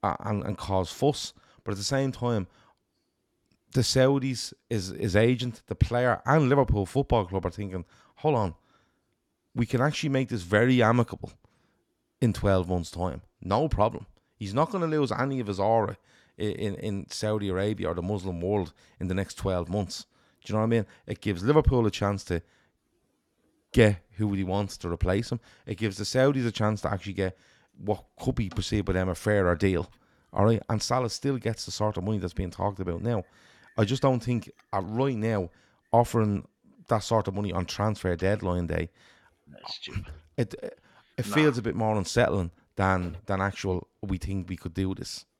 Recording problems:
none

